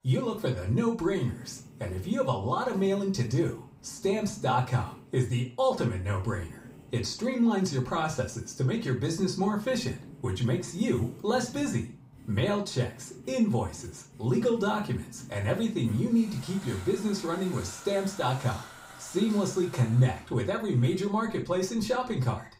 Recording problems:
off-mic speech; far
room echo; slight; dies away in 0.3 s
household noises; noticeable; throughout; 20 dB below the speech

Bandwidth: 15.5 kHz